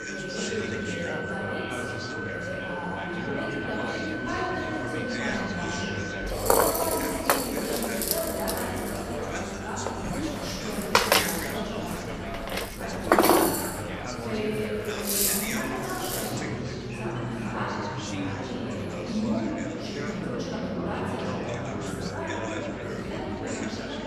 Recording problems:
room echo; strong; dies away in 2 s
off-mic speech; far
background music; very loud; throughout; 5 dB above the speech
chatter from many people; very loud; throughout; as loud as the speech

